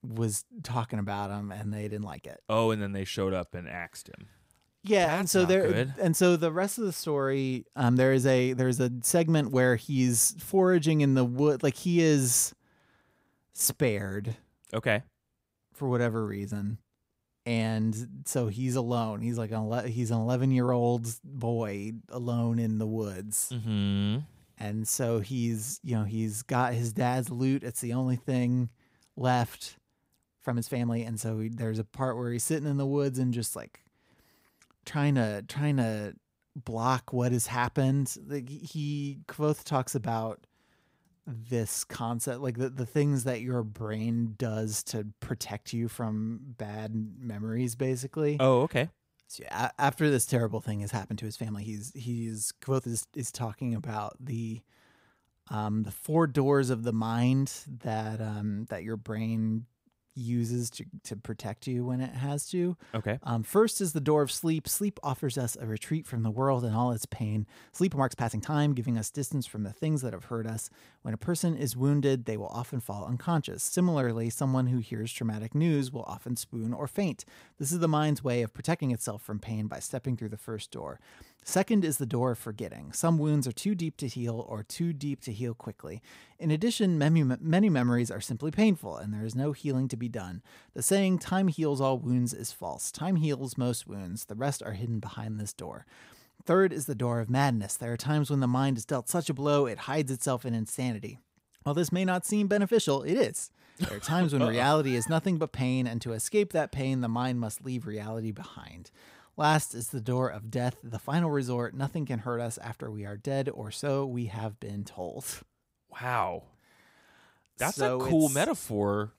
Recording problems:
uneven, jittery; strongly; from 2 s to 1:50

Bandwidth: 15.5 kHz